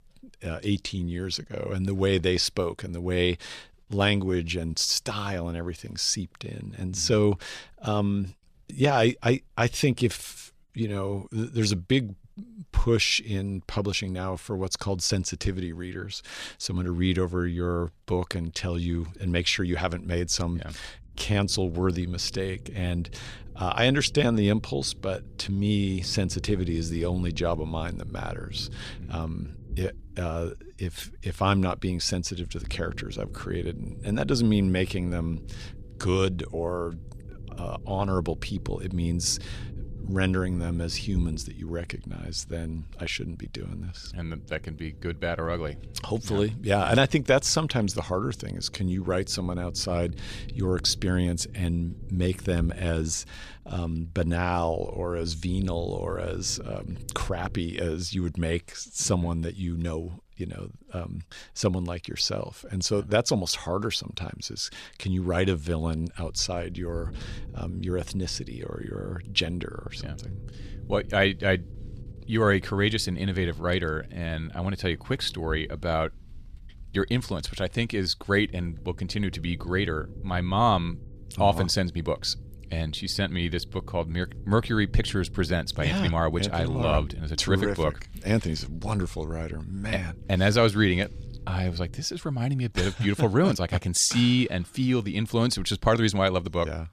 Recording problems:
low rumble; faint; from 19 to 58 s and from 1:06 to 1:32; 25 dB below the speech

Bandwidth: 14 kHz